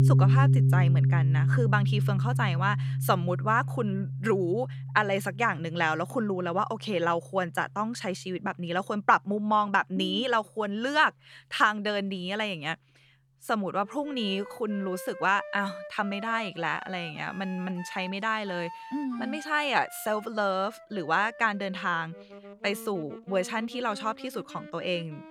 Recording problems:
background music; very loud; throughout; 1 dB above the speech

